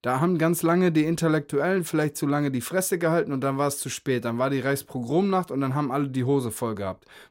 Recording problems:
none

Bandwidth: 16 kHz